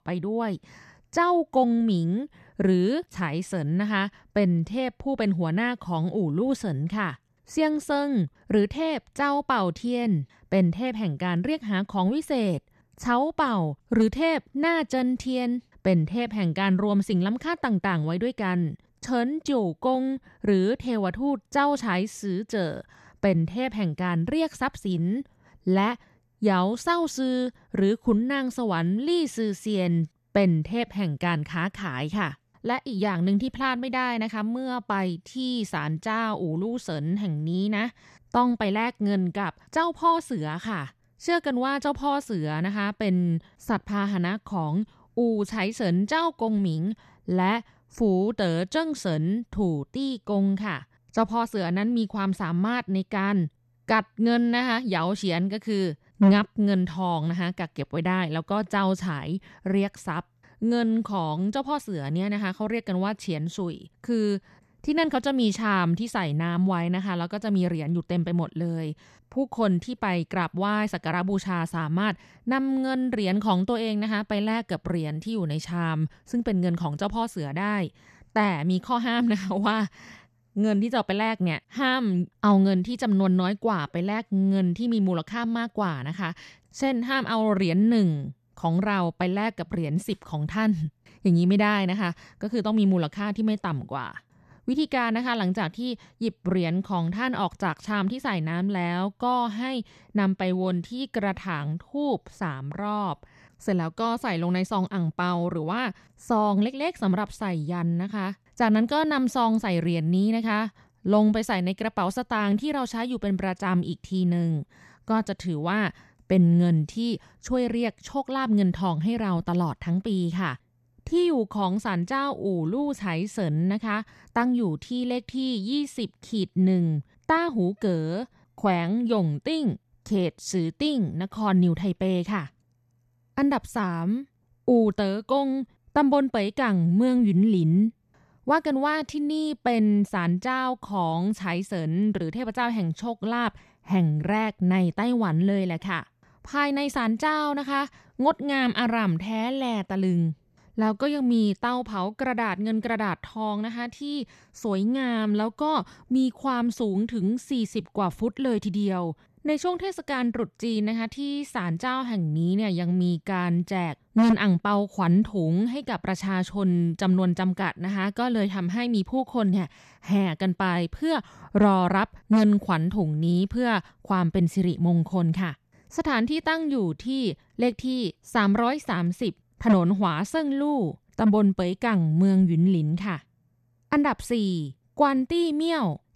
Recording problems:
none

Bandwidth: 13.5 kHz